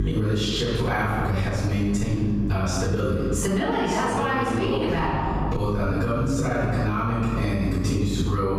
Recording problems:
room echo; strong; dies away in 1.2 s
off-mic speech; far
squashed, flat; somewhat
electrical hum; noticeable; throughout; 50 Hz, 20 dB below the speech

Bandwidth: 14.5 kHz